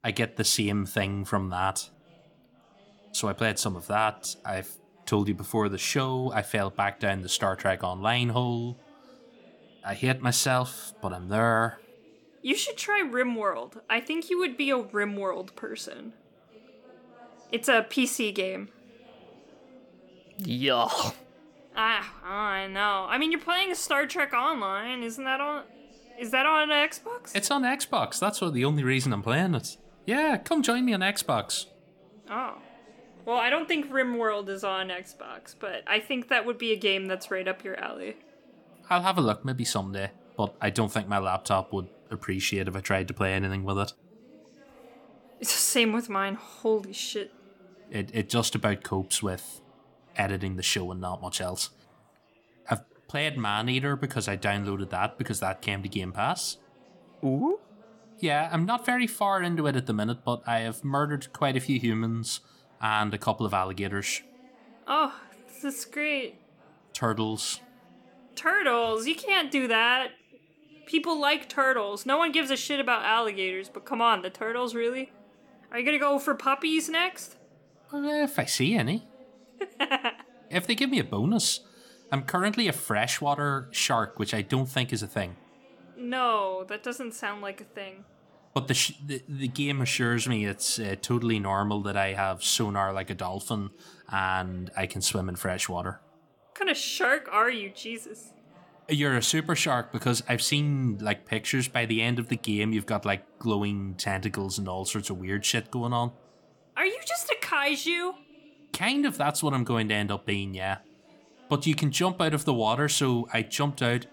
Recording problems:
background chatter; faint; throughout; 4 voices, 30 dB below the speech

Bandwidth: 17.5 kHz